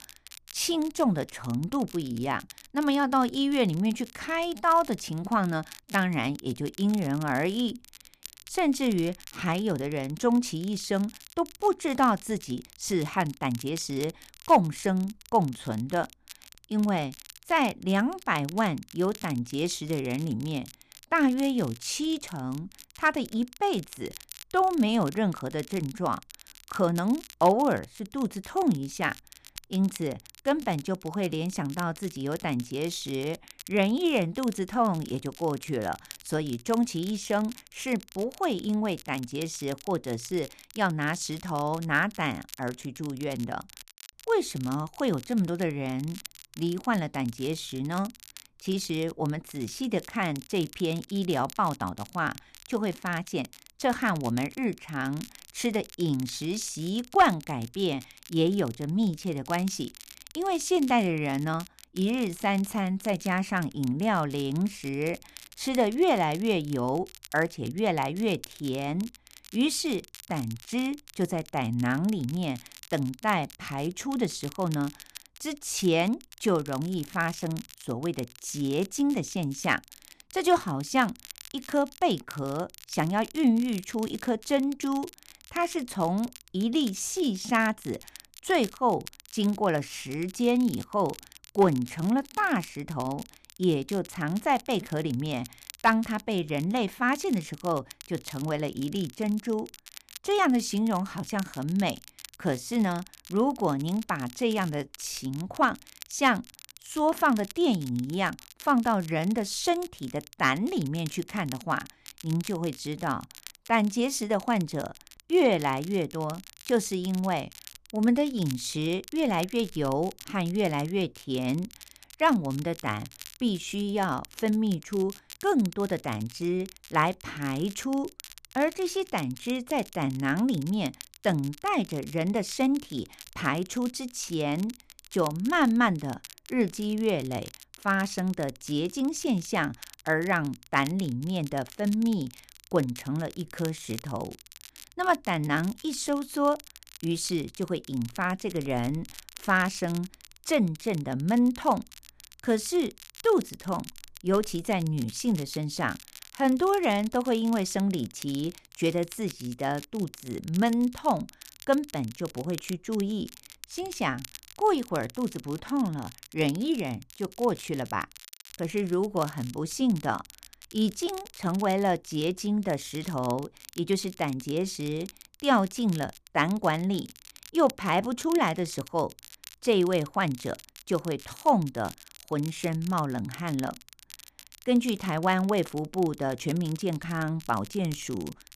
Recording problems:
crackle, like an old record; noticeable; 20 dB below the speech

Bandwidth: 14.5 kHz